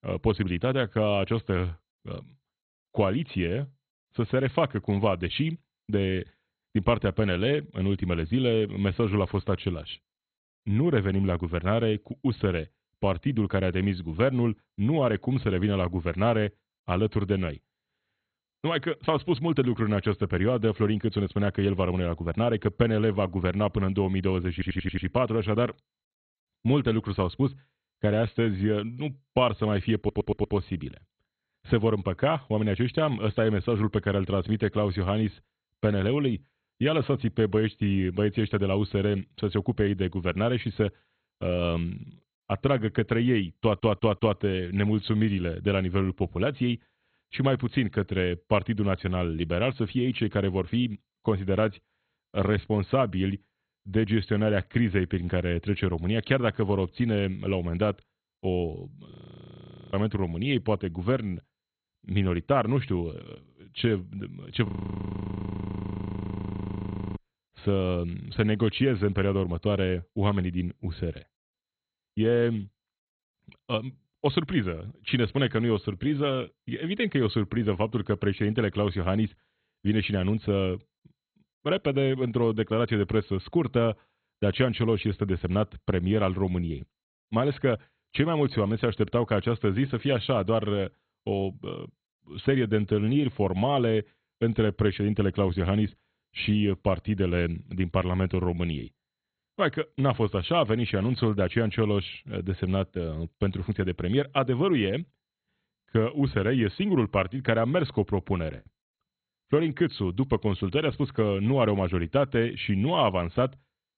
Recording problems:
garbled, watery; badly; nothing above 4 kHz
audio stuttering; at 25 s, at 30 s and at 44 s
audio freezing; at 59 s for 1 s and at 1:05 for 2.5 s
choppy; occasionally; at 1:49; 3% of the speech affected

